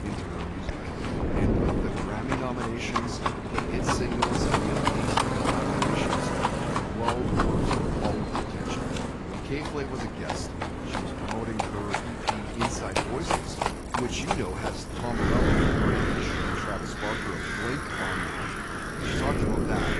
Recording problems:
distortion; slight; 0.3% of the sound clipped
garbled, watery; slightly; nothing above 10.5 kHz
animal sounds; very loud; throughout; 3 dB above the speech
traffic noise; very loud; throughout; 1 dB above the speech
wind noise on the microphone; heavy; 2 dB below the speech

